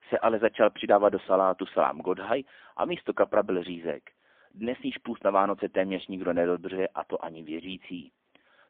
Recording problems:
phone-call audio; poor line; nothing above 3.5 kHz

